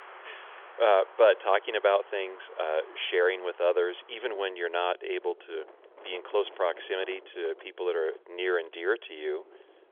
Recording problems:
phone-call audio; nothing above 3.5 kHz
wind in the background; faint; throughout; 20 dB below the speech

